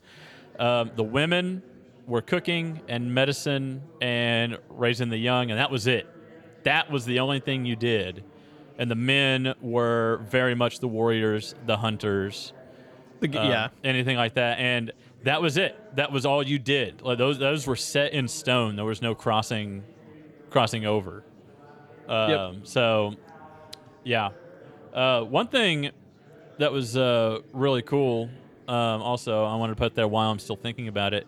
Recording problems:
chatter from many people; faint; throughout; 25 dB below the speech

